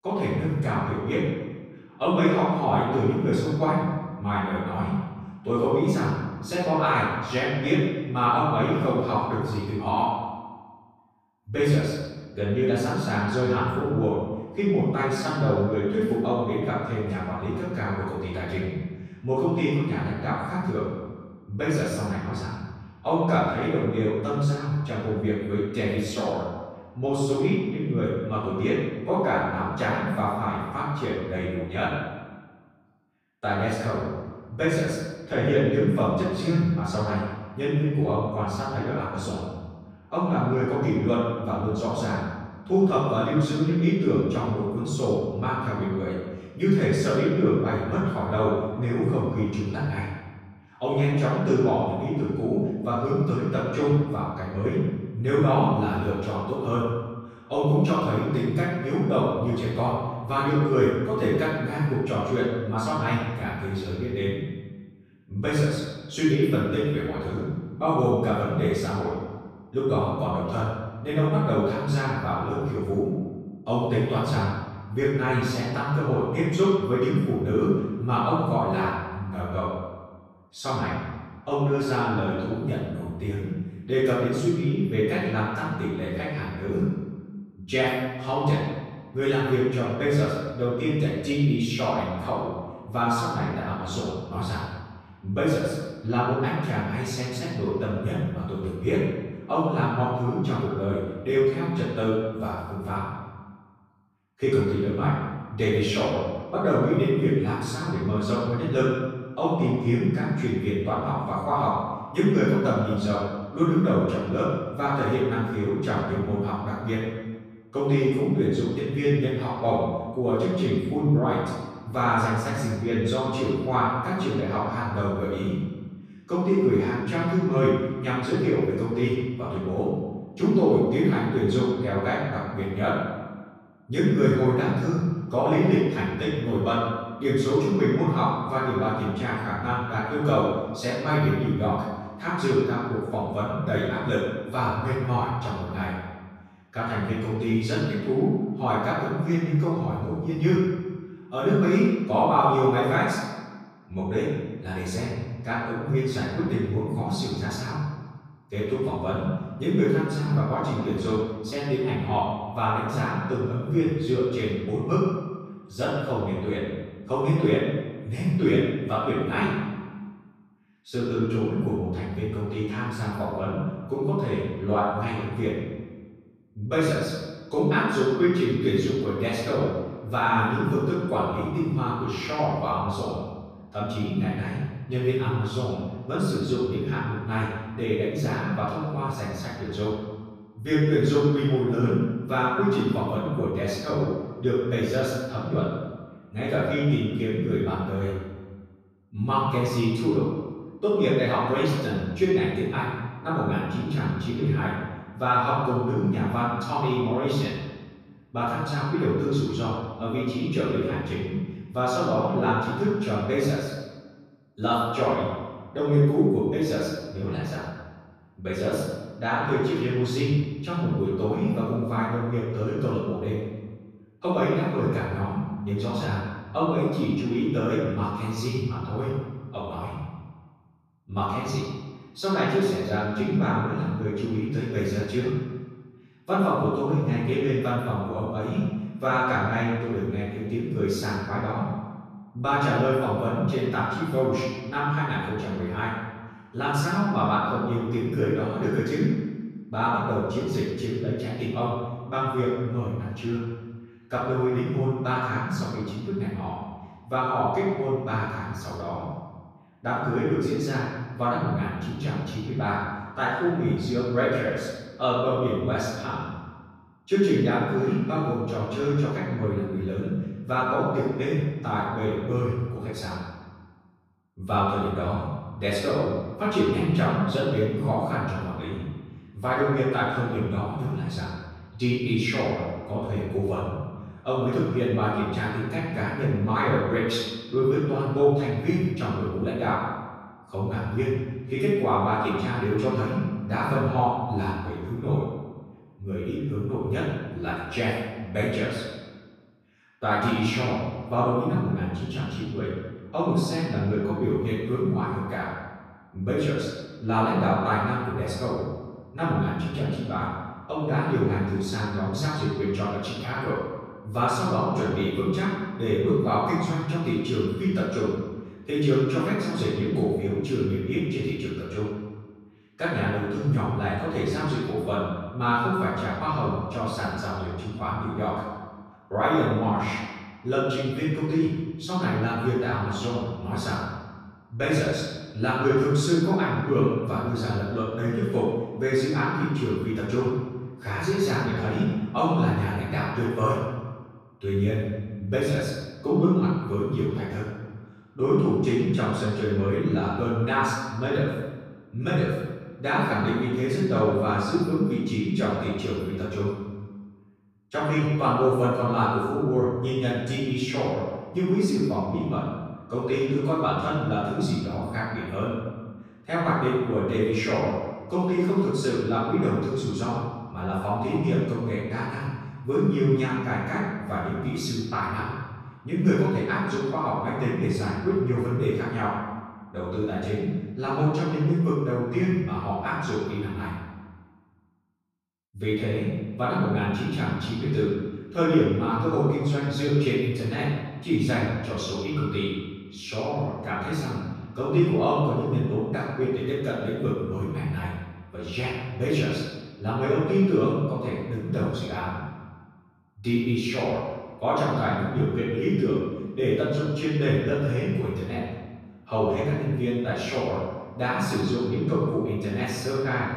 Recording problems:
room echo; strong; dies away in 1.2 s
off-mic speech; far

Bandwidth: 14.5 kHz